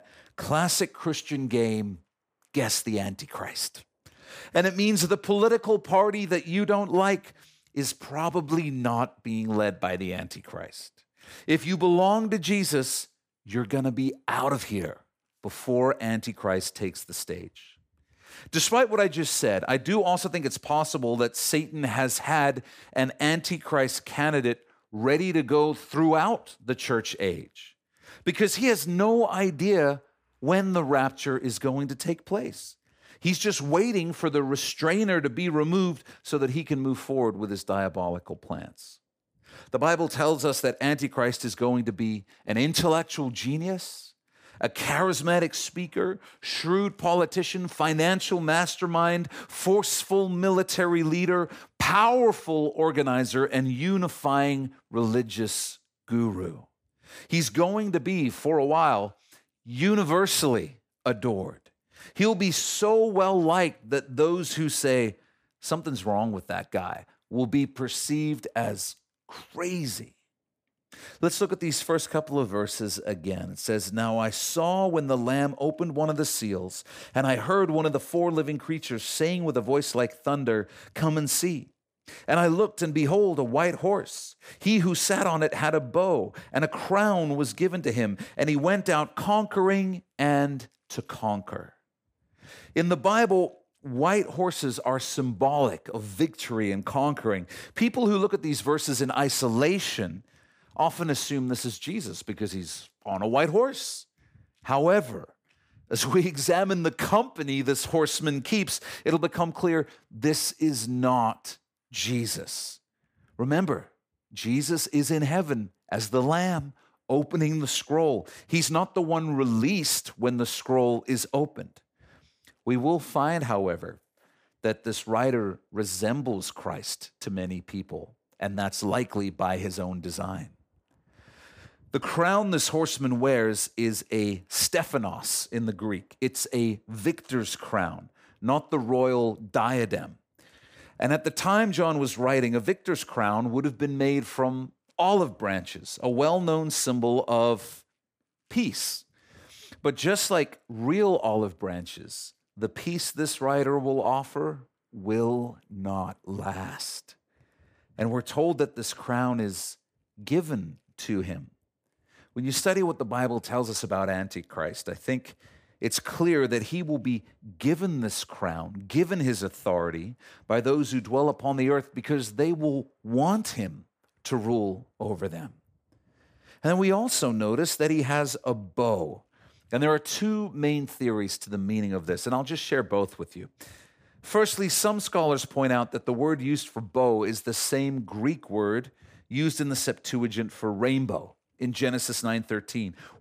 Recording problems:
none

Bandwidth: 15 kHz